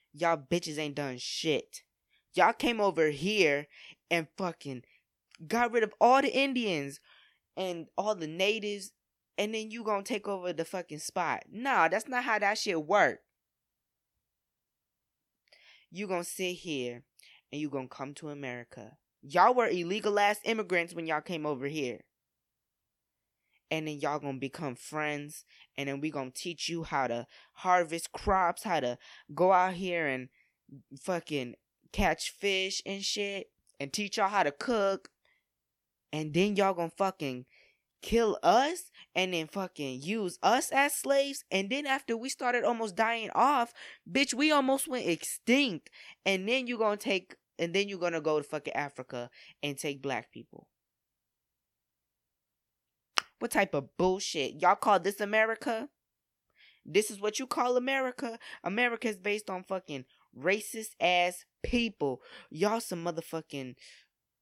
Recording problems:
none

